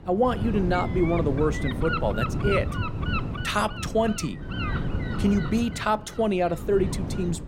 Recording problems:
wind noise on the microphone; heavy; 6 dB below the speech

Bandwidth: 16.5 kHz